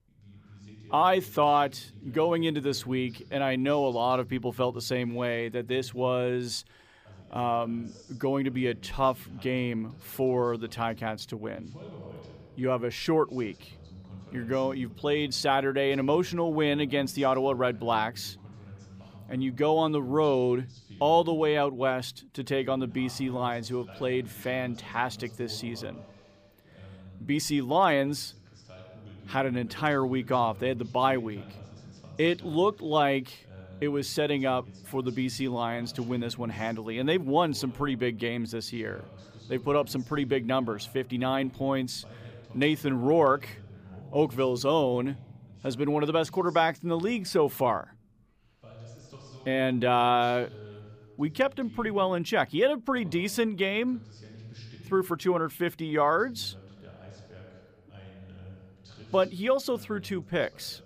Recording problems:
voice in the background; faint; throughout; 20 dB below the speech

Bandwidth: 15 kHz